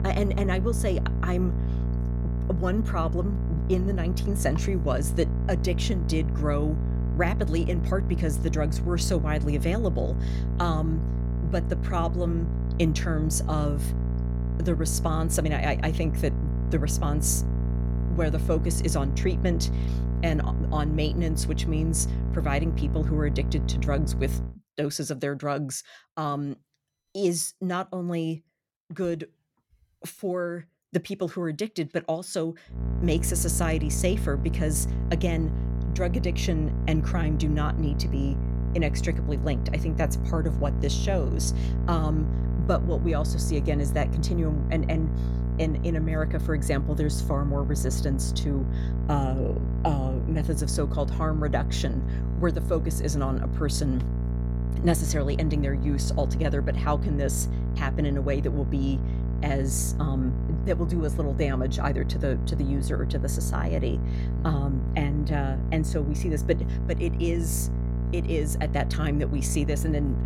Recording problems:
electrical hum; loud; until 24 s and from 33 s on; 60 Hz, 8 dB below the speech

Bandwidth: 17 kHz